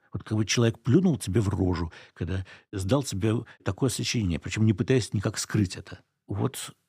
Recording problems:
none

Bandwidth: 15 kHz